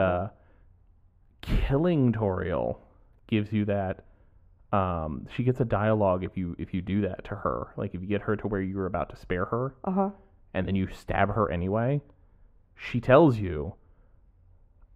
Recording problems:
muffled; very; fading above 3 kHz
abrupt cut into speech; at the start

